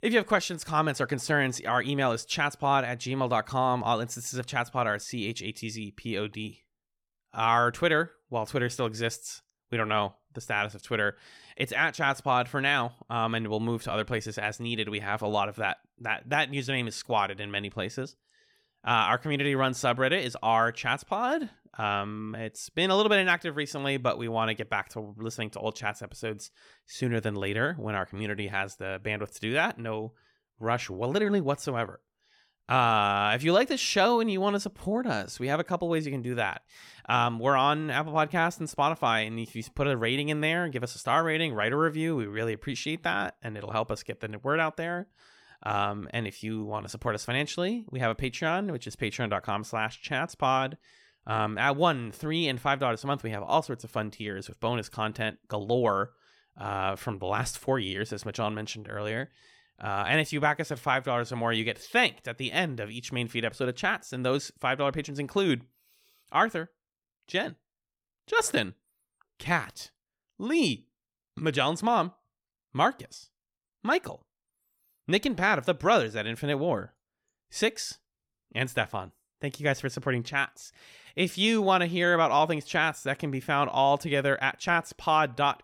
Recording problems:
none

